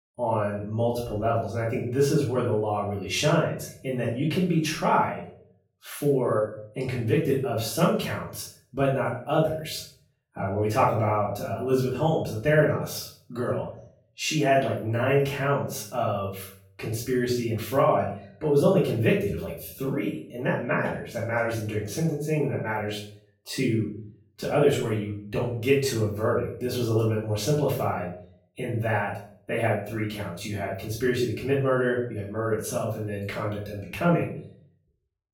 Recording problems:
off-mic speech; far
room echo; noticeable; dies away in 0.5 s

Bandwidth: 17 kHz